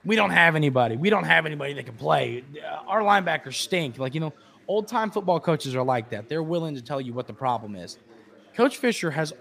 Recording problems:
chatter from many people; faint; throughout; 30 dB below the speech

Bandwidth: 15 kHz